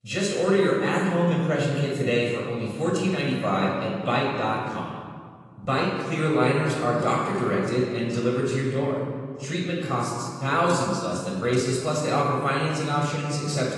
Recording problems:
off-mic speech; far
room echo; noticeable; dies away in 1.5 s
garbled, watery; slightly; nothing above 10.5 kHz

